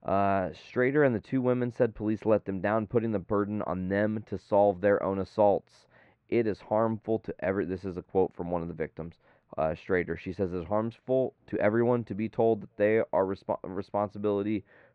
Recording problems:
muffled; very; fading above 1.5 kHz

